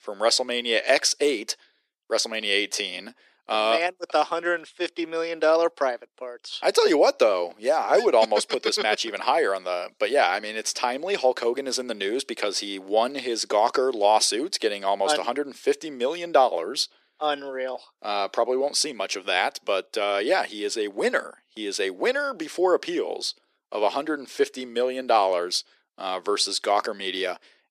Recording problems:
thin; very; fading below 350 Hz

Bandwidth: 14 kHz